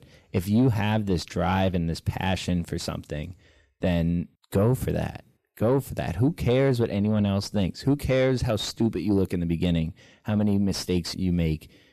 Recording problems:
distortion; slight; 10 dB below the speech

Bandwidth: 14.5 kHz